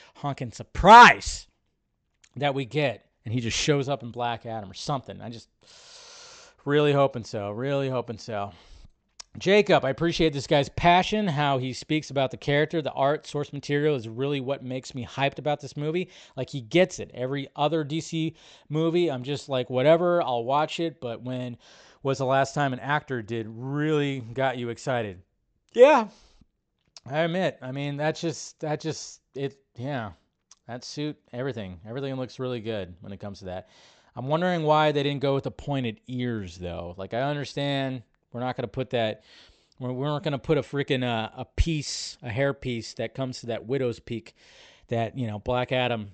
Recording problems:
high frequencies cut off; noticeable; nothing above 8 kHz

